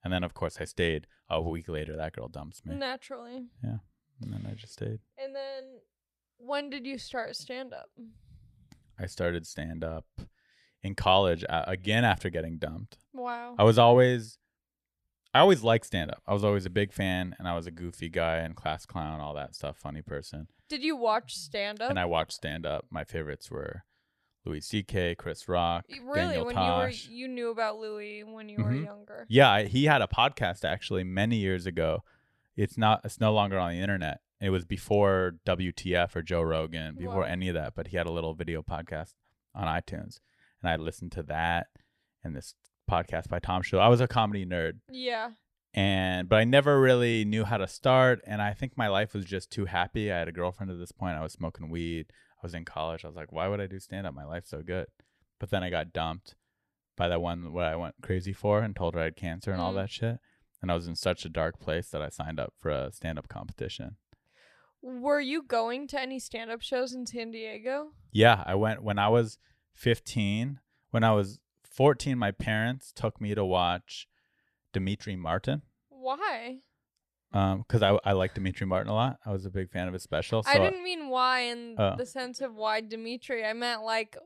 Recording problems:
none

